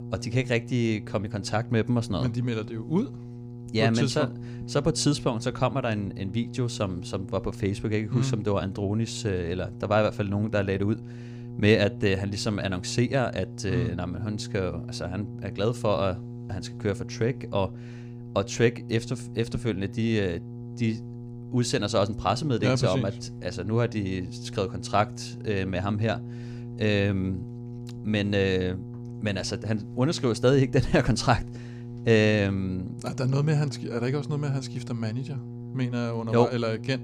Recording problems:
electrical hum; noticeable; throughout; 60 Hz, 15 dB below the speech

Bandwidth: 15.5 kHz